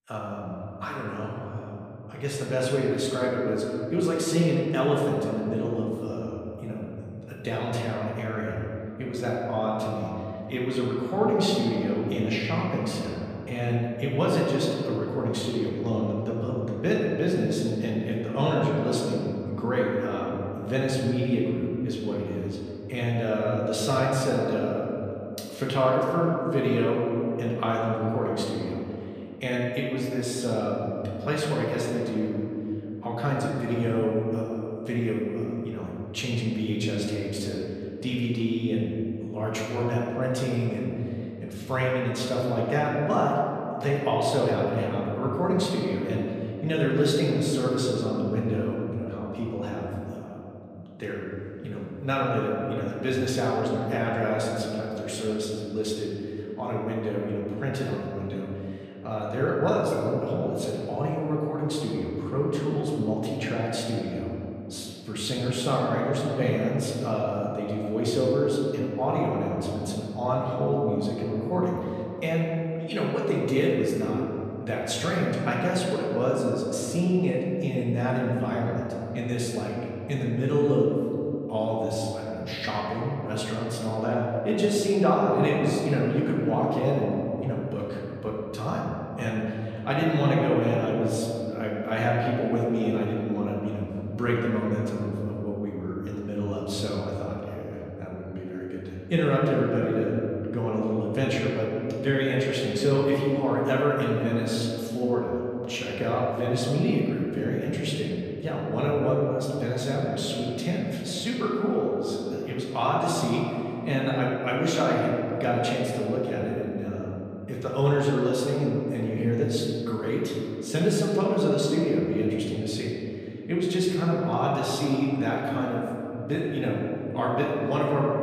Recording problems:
off-mic speech; far
room echo; noticeable; dies away in 2.8 s

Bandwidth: 14.5 kHz